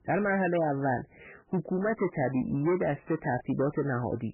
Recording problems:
garbled, watery; badly; nothing above 3 kHz
distortion; slight; 11% of the sound clipped

